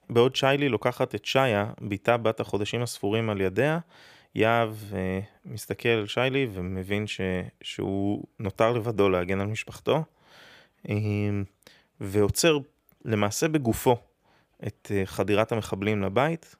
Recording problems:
none

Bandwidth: 15 kHz